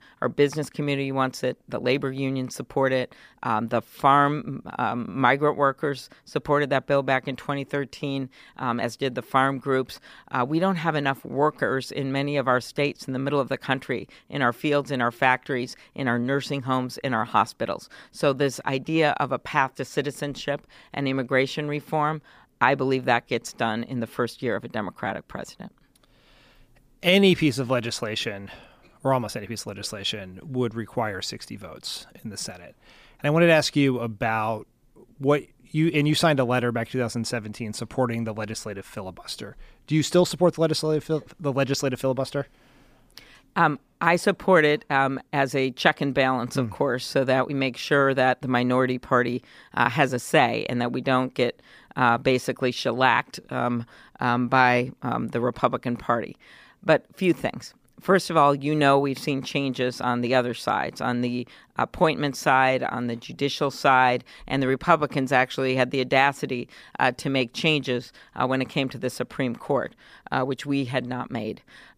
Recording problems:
none

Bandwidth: 15 kHz